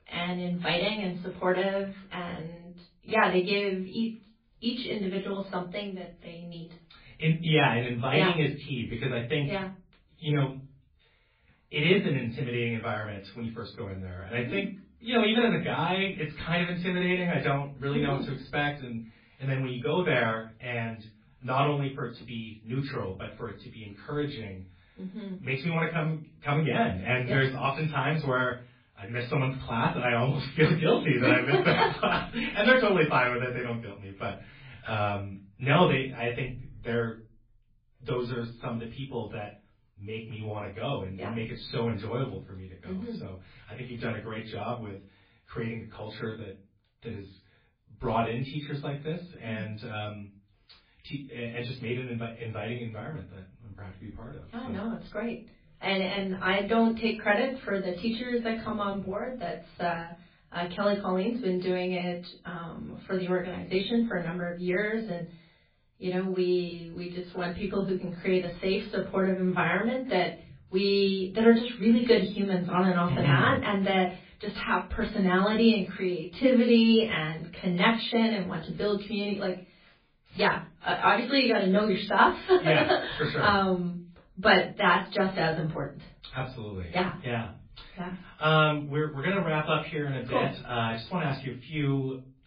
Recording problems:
off-mic speech; far
garbled, watery; badly; nothing above 4.5 kHz
room echo; slight; dies away in 0.3 s

